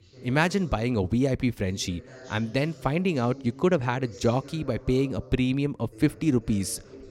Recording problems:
voice in the background; faint; throughout; 20 dB below the speech

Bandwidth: 16 kHz